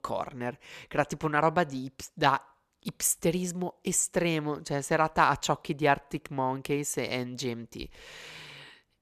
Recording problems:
none

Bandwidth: 14 kHz